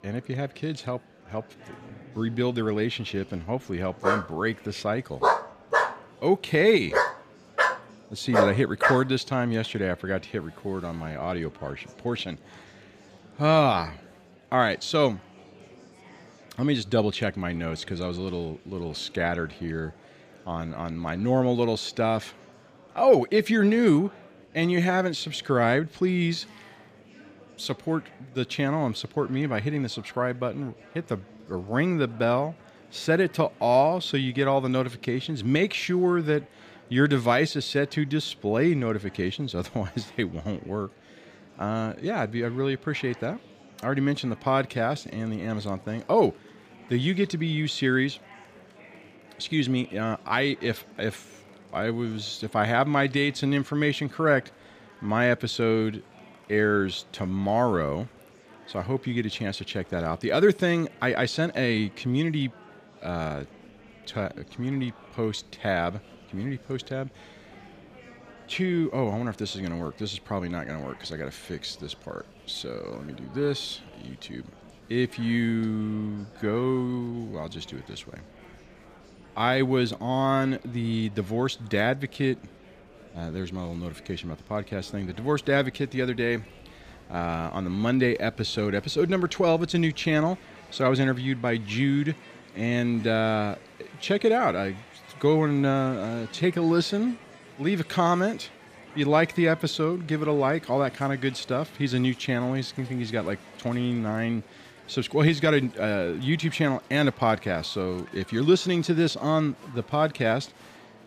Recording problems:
murmuring crowd; faint; throughout; 25 dB below the speech
dog barking; loud; from 4 to 9 s; peak 3 dB above the speech

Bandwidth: 15 kHz